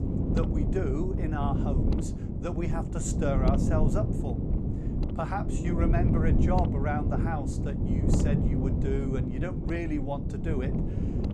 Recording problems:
wind noise on the microphone; heavy; 2 dB below the speech

